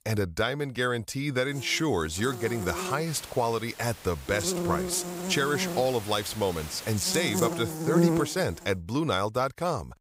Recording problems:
electrical hum; loud; from 1.5 to 3 s, from 4.5 to 6 s and from 6.5 to 8.5 s; 50 Hz, 5 dB below the speech
hiss; noticeable; from 3 to 7 s; 15 dB below the speech

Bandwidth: 15.5 kHz